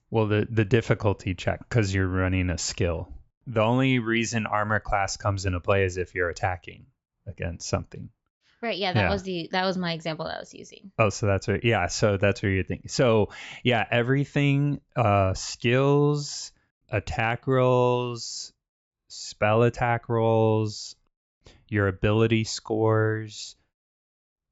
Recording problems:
high frequencies cut off; noticeable; nothing above 8 kHz

